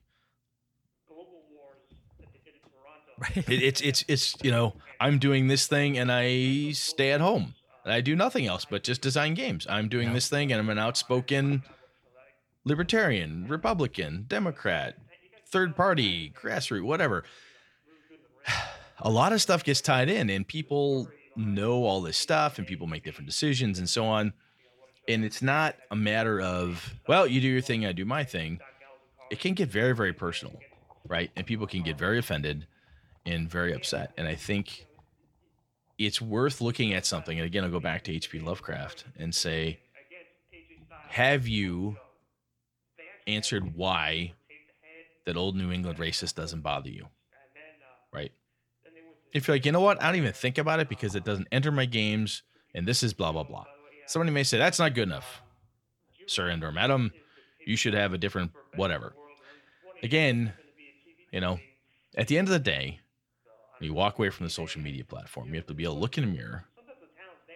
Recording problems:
voice in the background; faint; throughout; 25 dB below the speech

